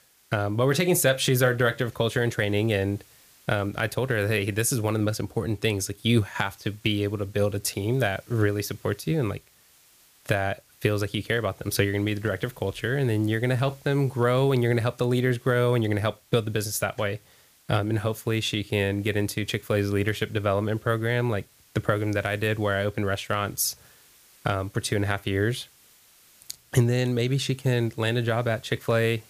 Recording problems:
hiss; faint; throughout; 30 dB below the speech

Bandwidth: 15 kHz